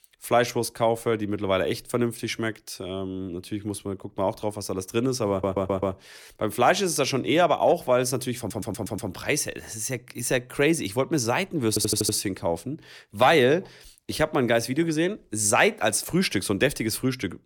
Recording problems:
audio stuttering; at 5.5 s, at 8.5 s and at 12 s

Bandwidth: 18 kHz